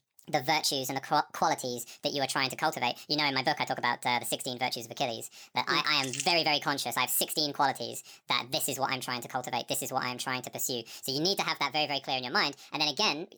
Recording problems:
wrong speed and pitch; too fast and too high; 1.6 times normal speed

